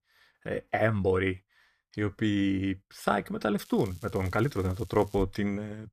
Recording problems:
crackling; faint; from 3.5 to 5 s; 25 dB below the speech

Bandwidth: 14.5 kHz